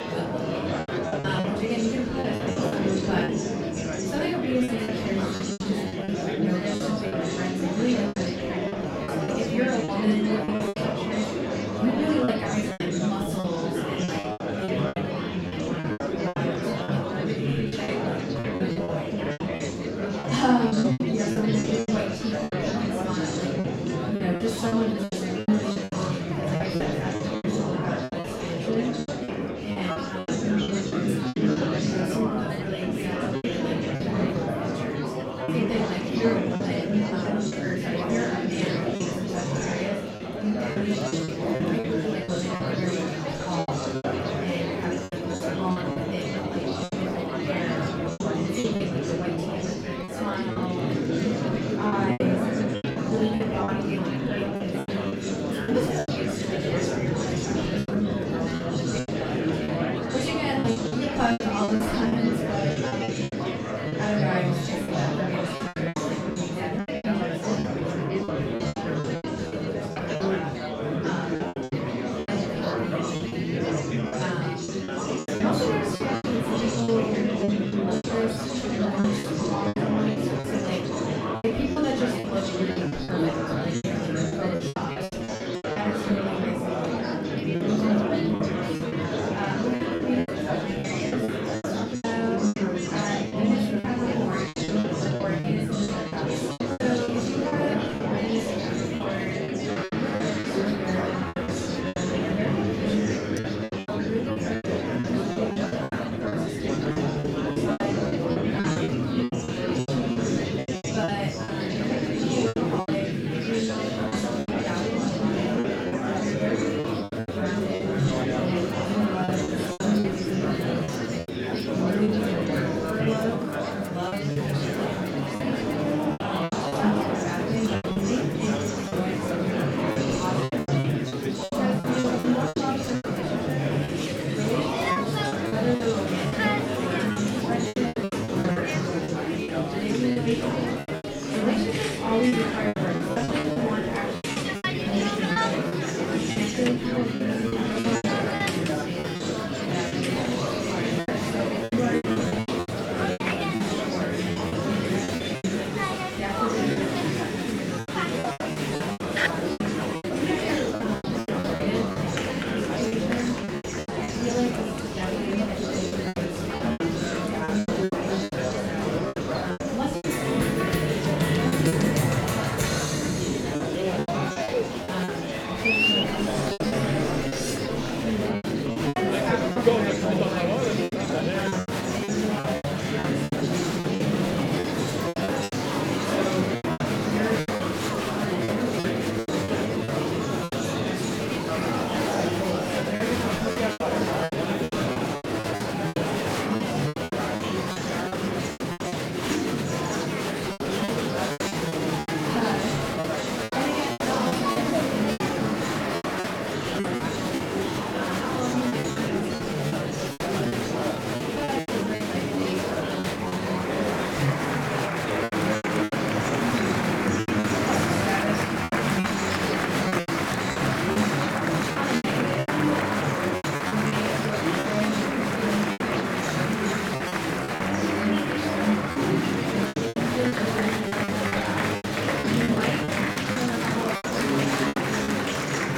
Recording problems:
off-mic speech; far
room echo; noticeable; dies away in 0.4 s
murmuring crowd; very loud; throughout; 5 dB above the speech
background music; noticeable; throughout; 15 dB below the speech
choppy; very; 11% of the speech affected
clattering dishes; very faint; at 1:43; peak 15 dB below the speech
clattering dishes; noticeable; from 2:56 to 2:58; peak 2 dB below the speech

